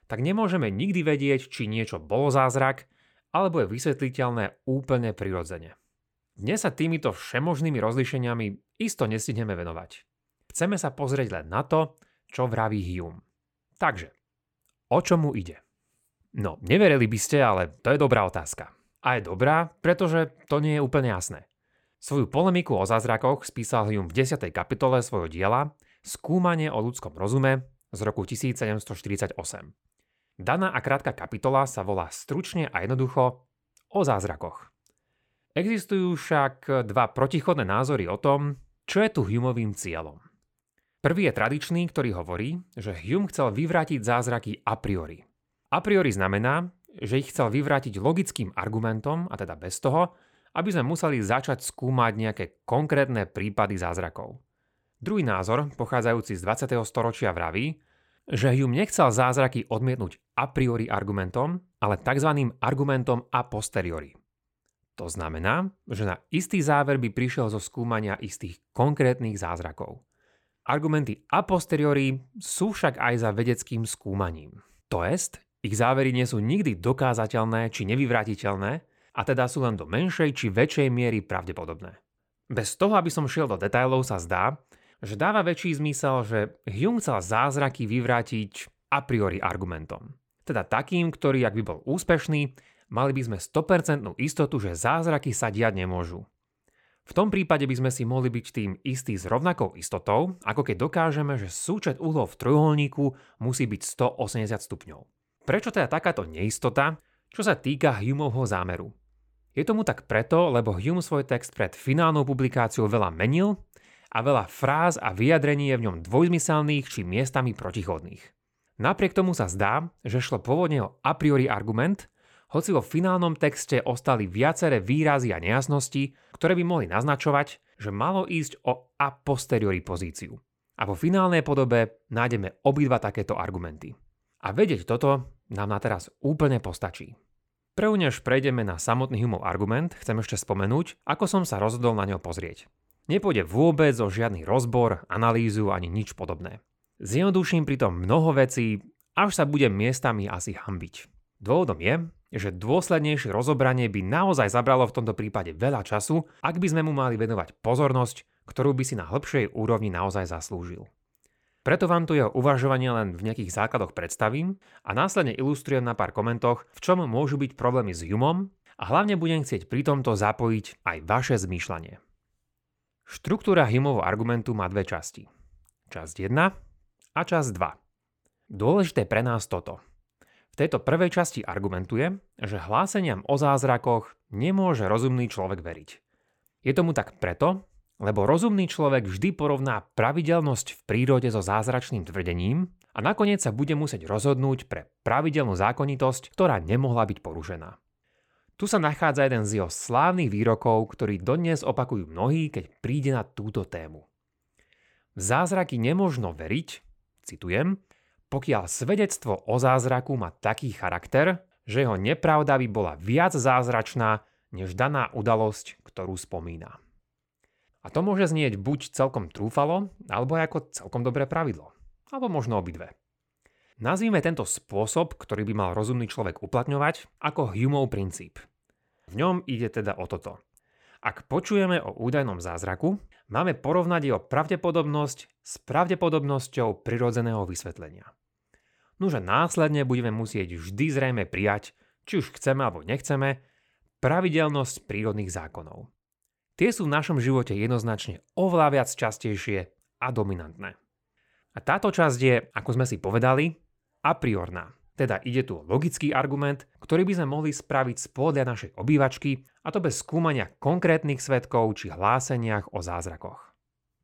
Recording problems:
none

